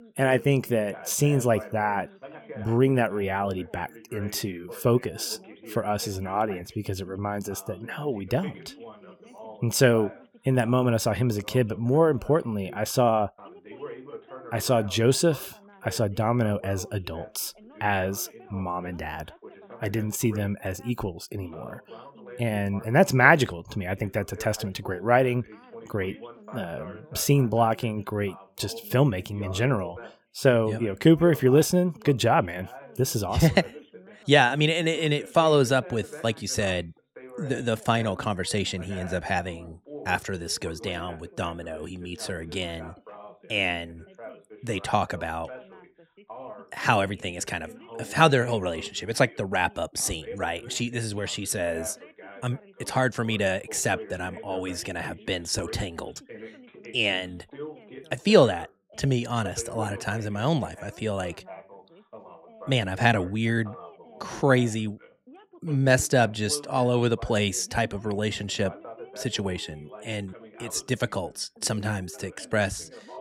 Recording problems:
background chatter; noticeable; throughout; 2 voices, 20 dB below the speech

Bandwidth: 18 kHz